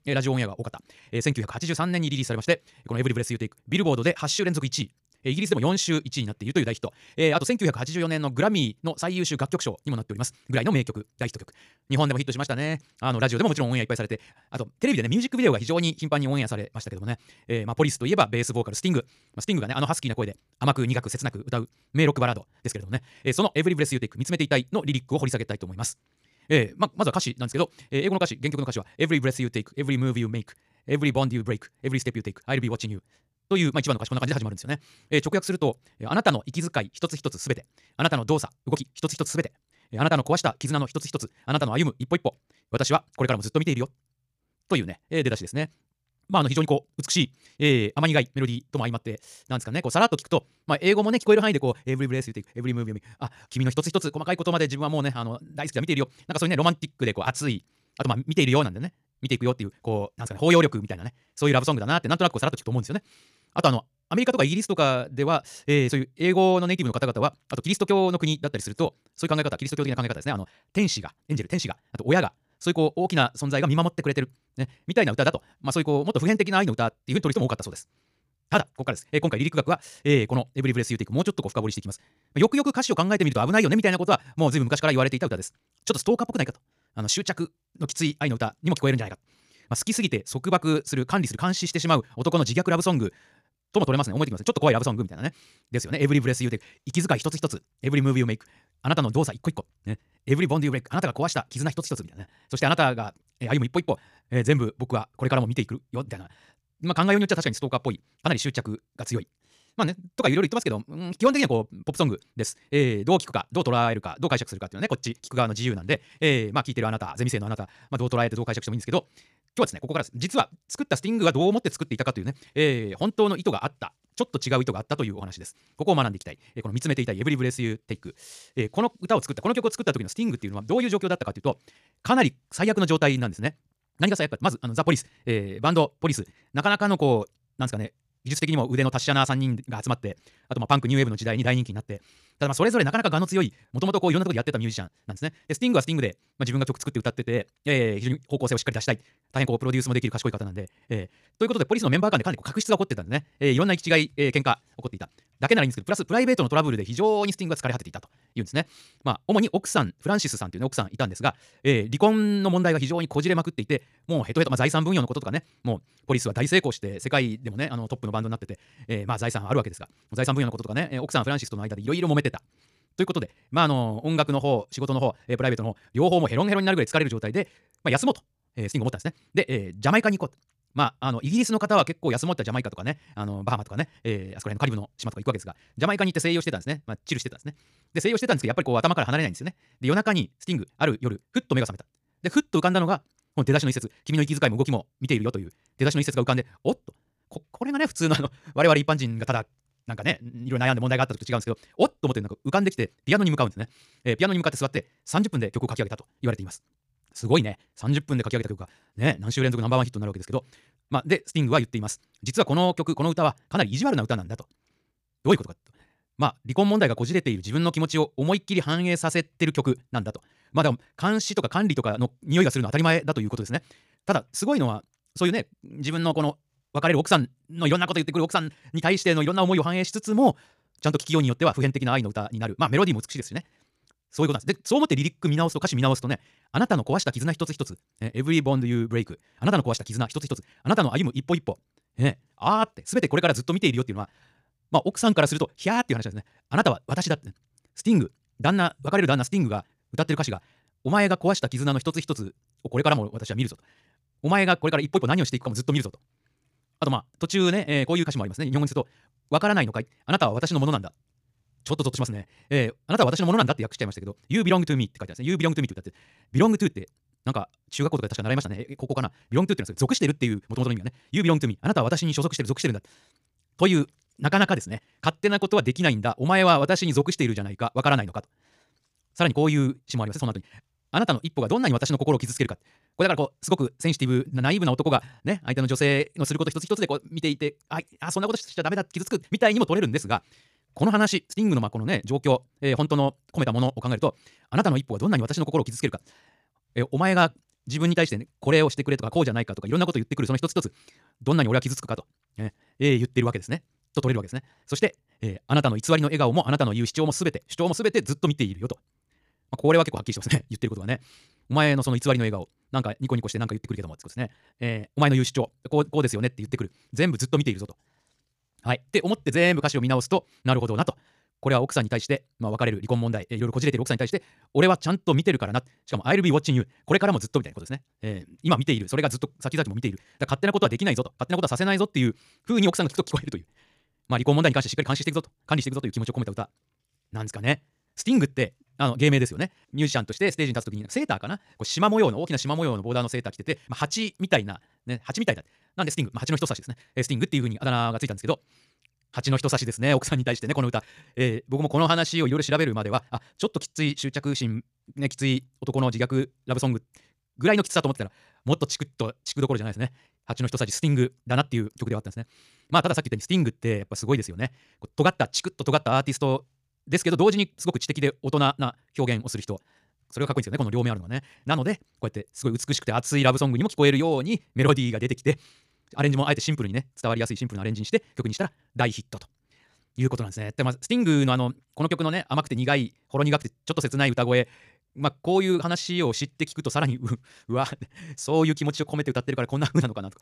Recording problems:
wrong speed, natural pitch; too fast; 1.8 times normal speed

